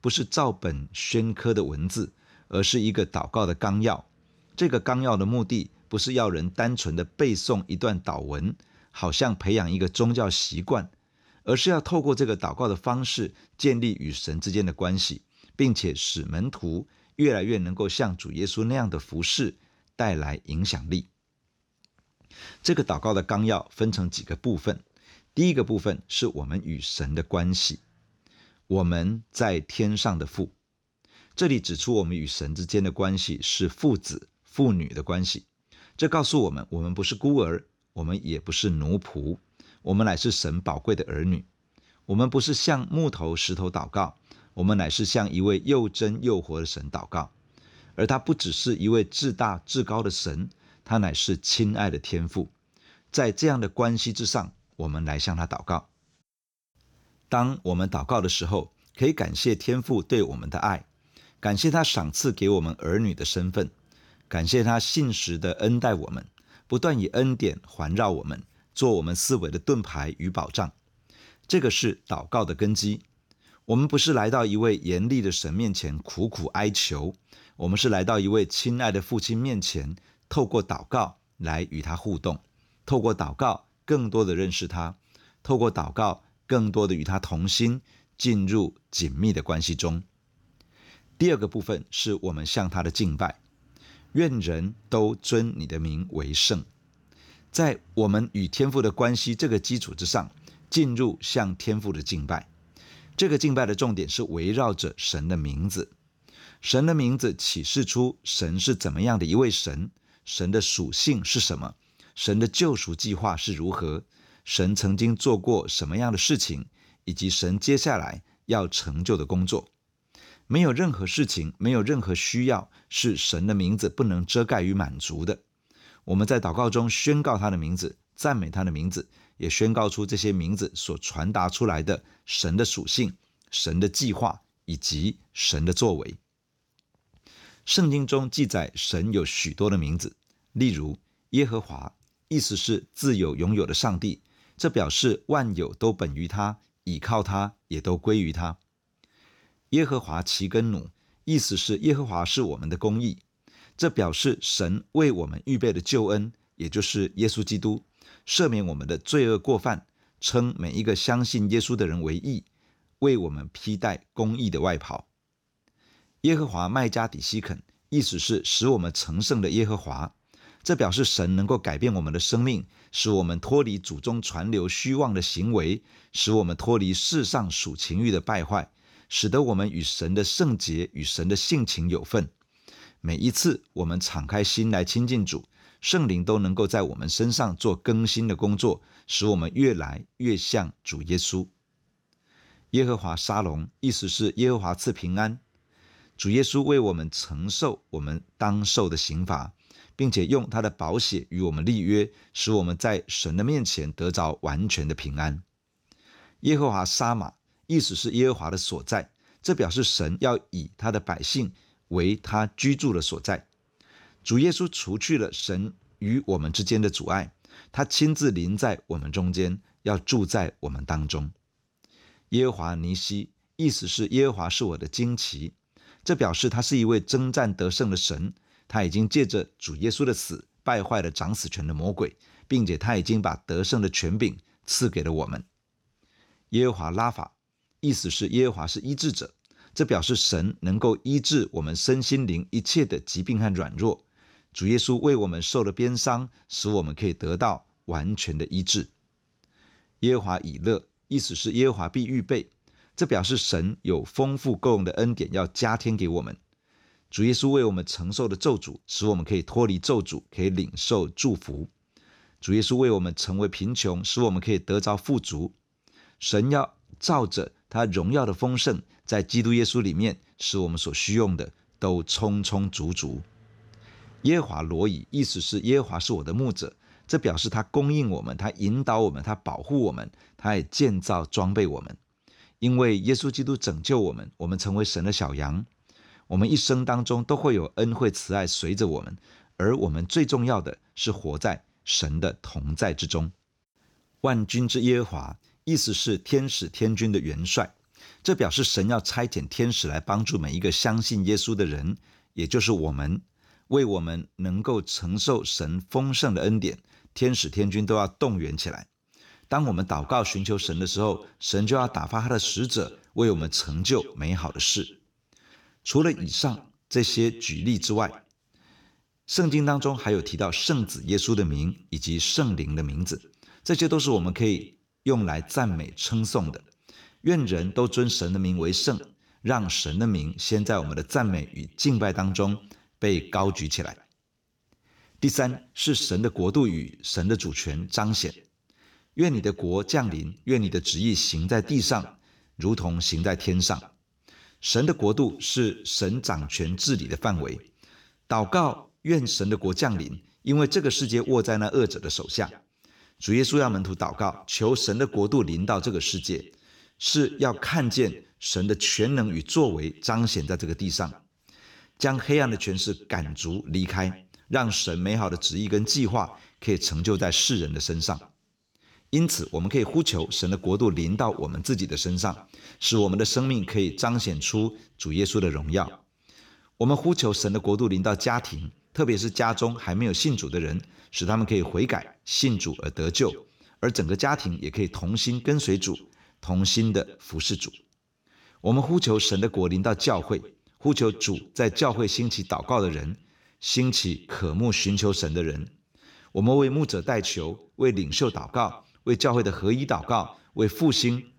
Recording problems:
echo of what is said; faint; from 5:09 on; 120 ms later, 20 dB below the speech

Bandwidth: 18.5 kHz